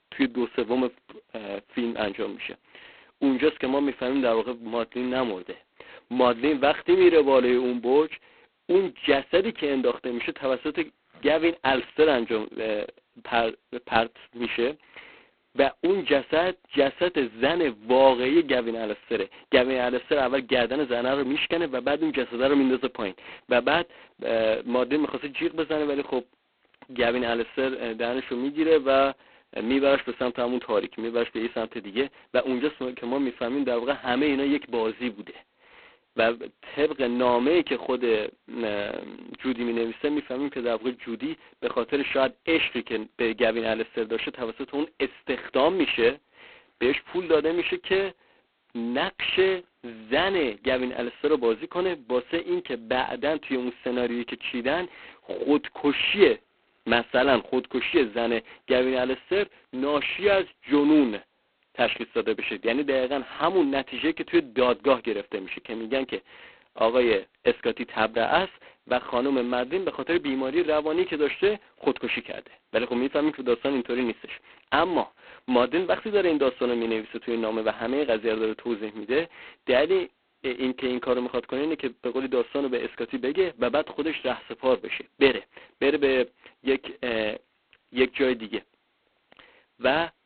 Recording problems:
phone-call audio; poor line; nothing above 4 kHz

